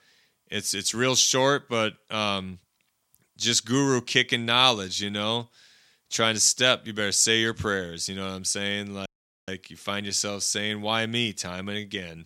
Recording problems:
audio cutting out; at 9 s

